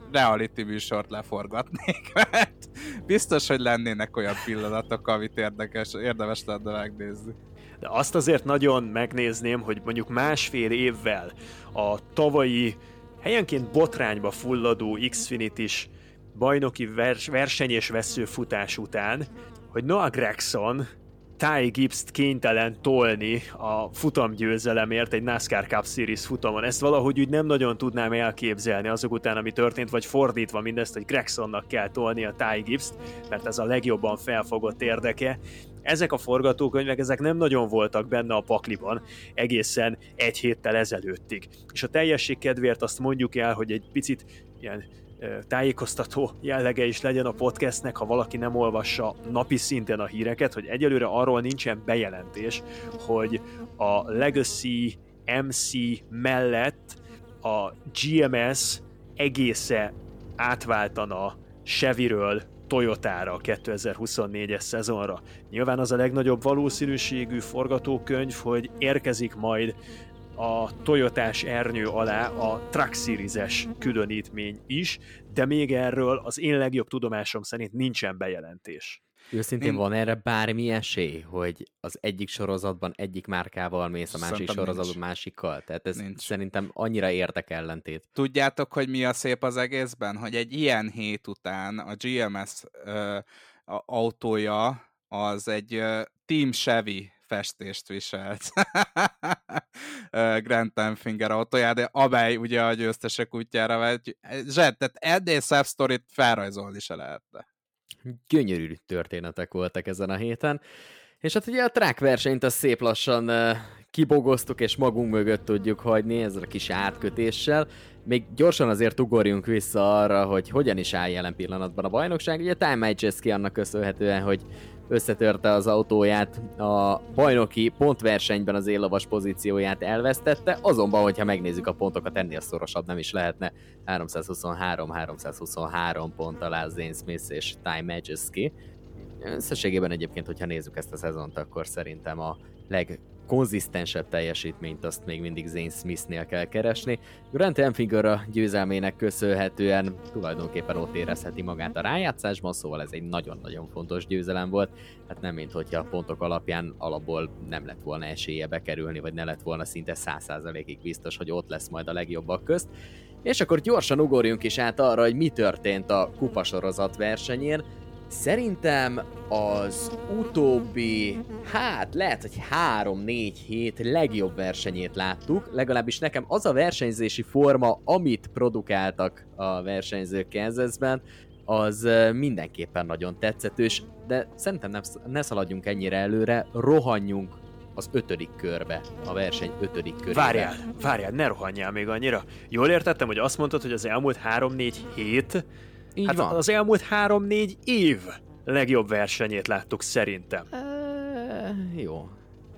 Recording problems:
electrical hum; faint; until 1:16 and from 1:54 on; 50 Hz, 20 dB below the speech

